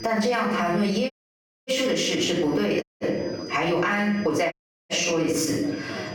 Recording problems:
off-mic speech; far
room echo; noticeable; dies away in 0.5 s
squashed, flat; somewhat, background pumping
background chatter; noticeable; throughout; 4 voices, 20 dB below the speech
high-pitched whine; faint; throughout; 5 kHz, 25 dB below the speech
audio cutting out; at 1 s for 0.5 s, at 3 s and at 4.5 s

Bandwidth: 18 kHz